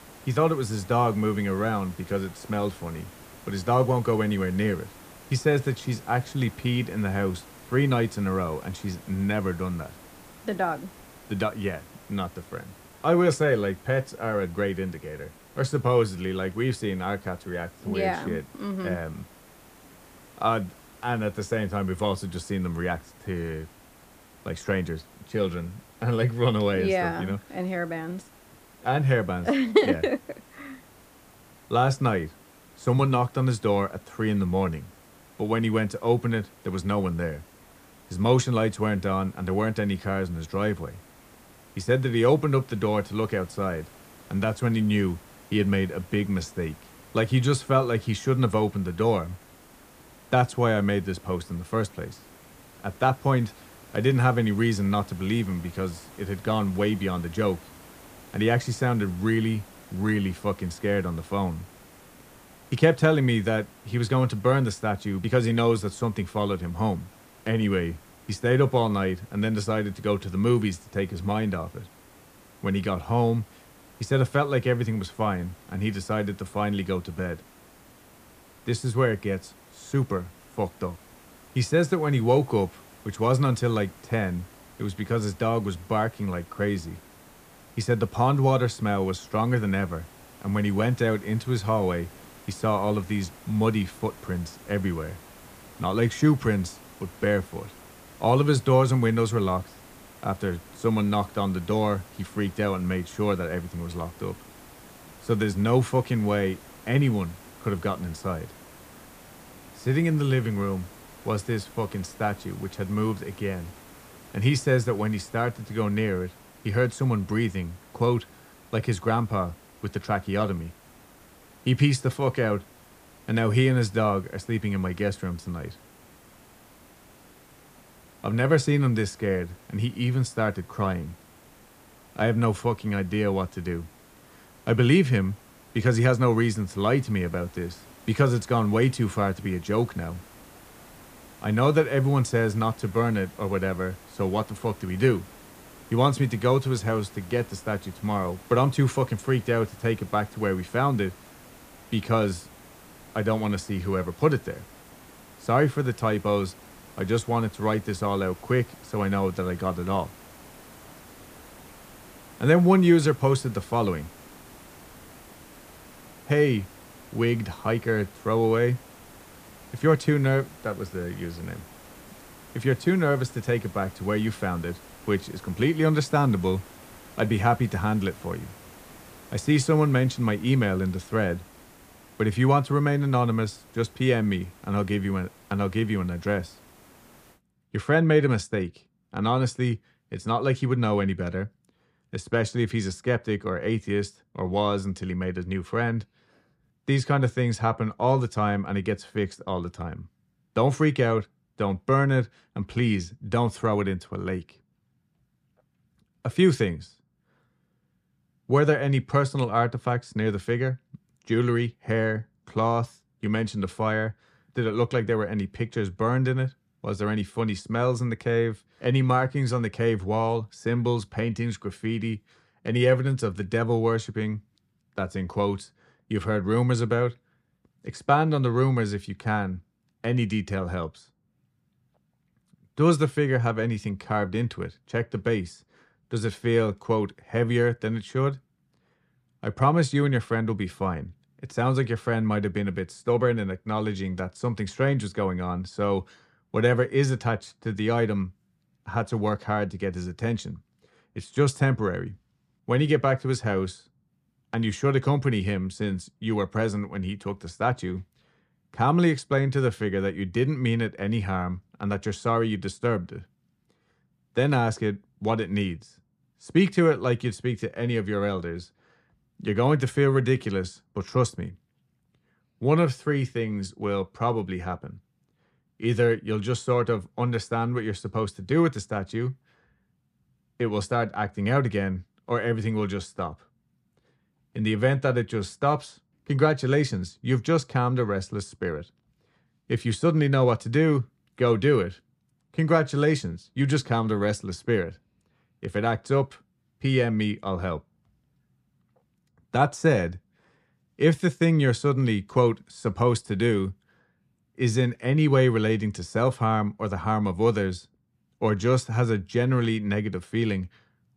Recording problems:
hiss; faint; until 3:07; 25 dB below the speech

